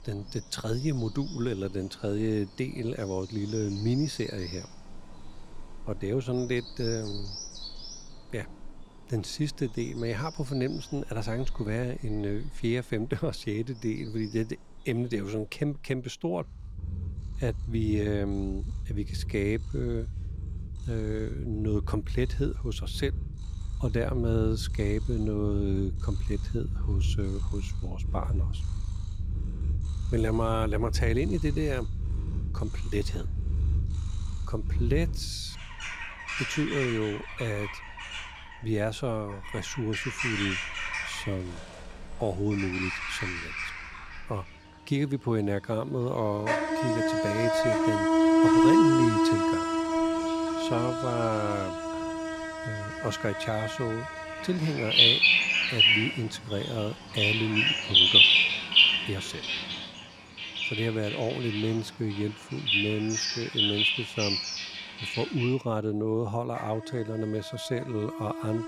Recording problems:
animal sounds; very loud; throughout; 5 dB above the speech

